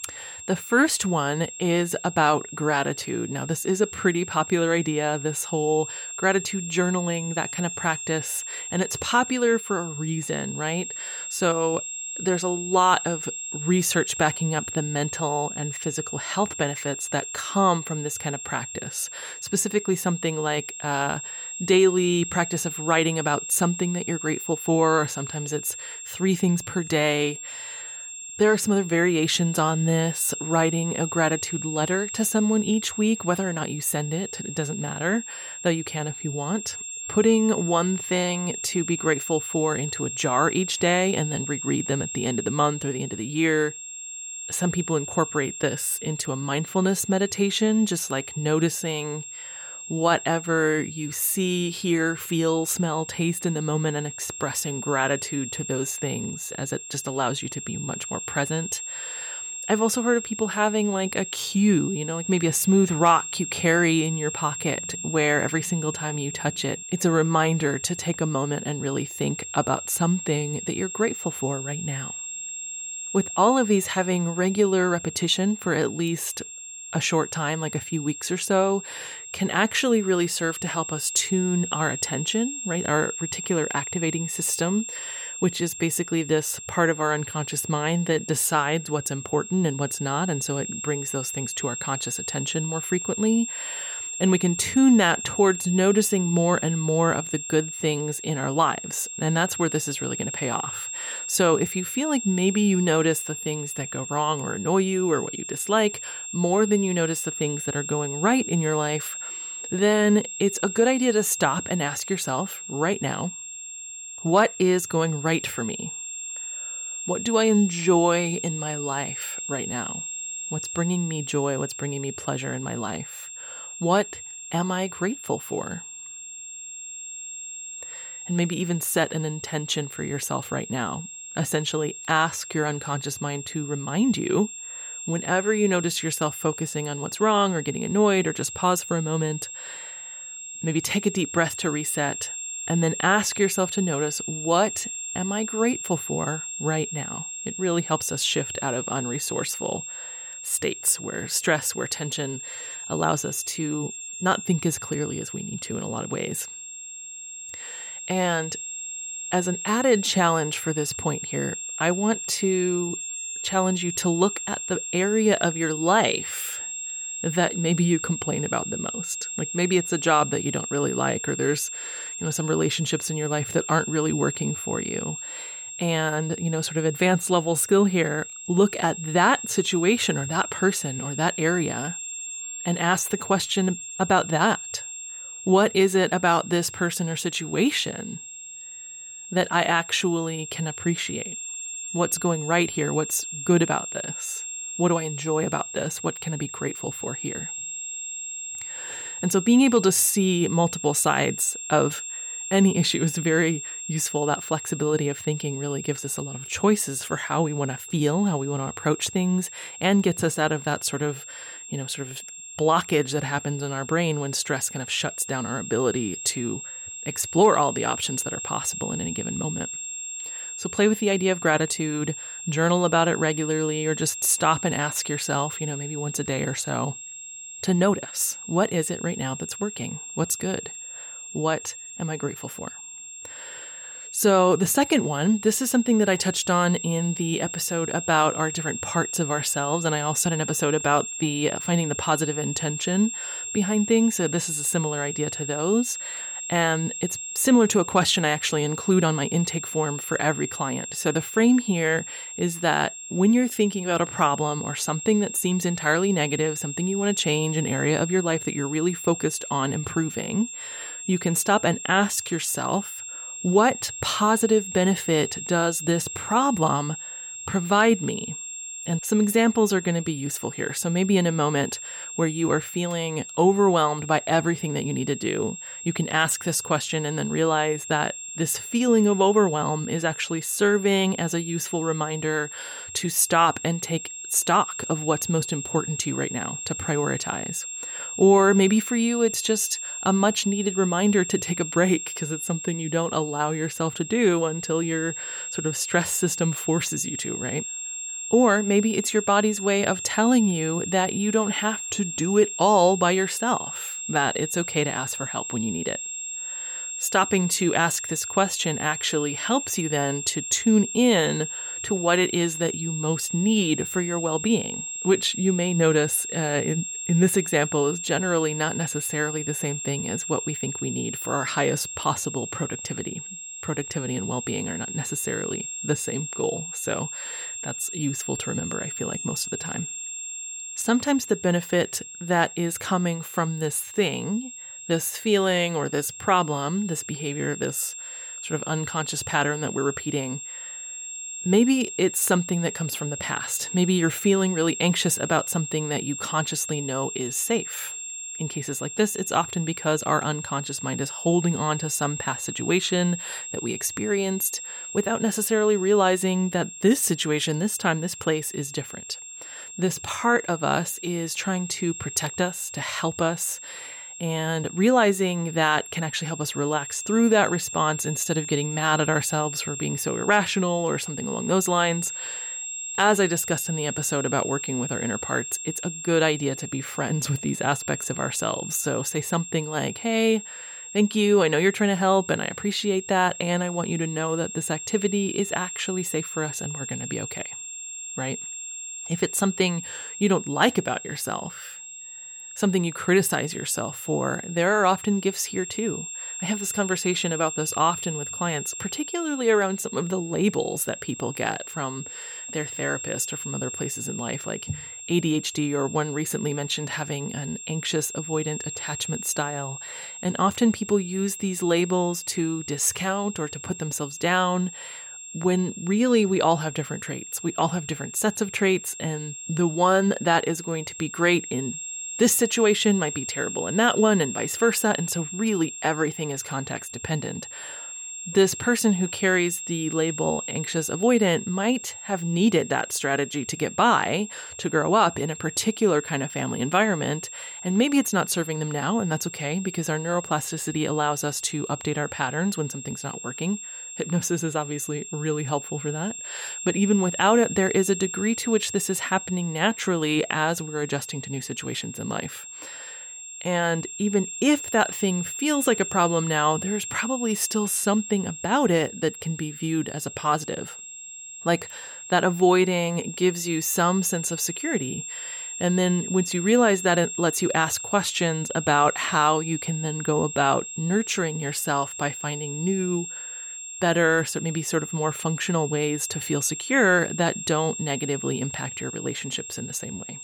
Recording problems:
high-pitched whine; loud; throughout; 7.5 kHz, 8 dB below the speech

